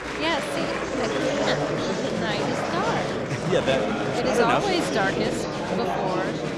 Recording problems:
murmuring crowd; very loud; throughout; 1 dB above the speech

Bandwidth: 13.5 kHz